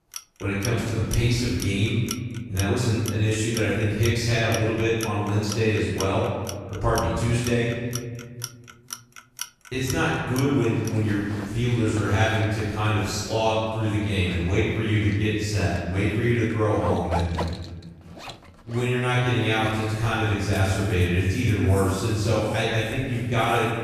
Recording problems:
room echo; strong; dies away in 1.6 s
off-mic speech; far
household noises; noticeable; throughout; 15 dB below the speech

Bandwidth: 14.5 kHz